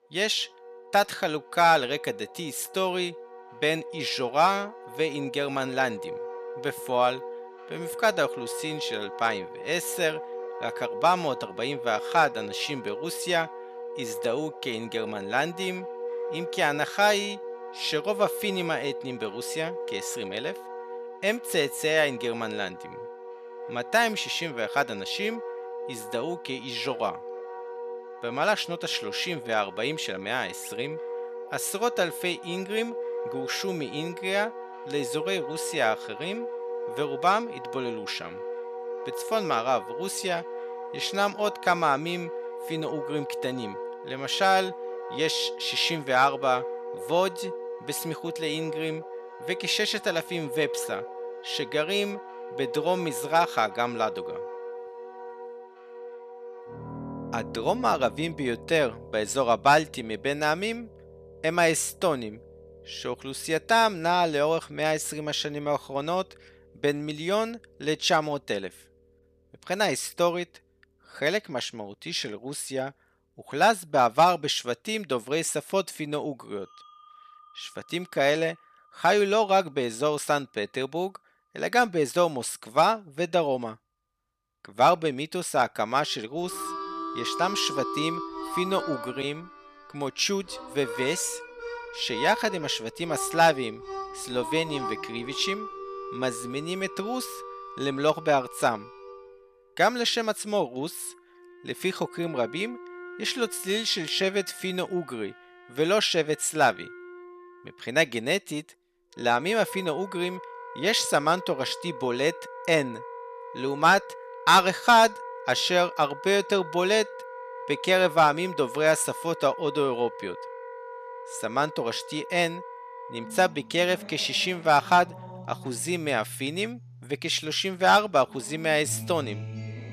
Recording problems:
background music; noticeable; throughout; 10 dB below the speech

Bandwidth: 14.5 kHz